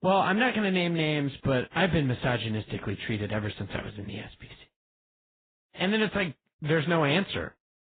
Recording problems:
garbled, watery; badly; nothing above 4 kHz

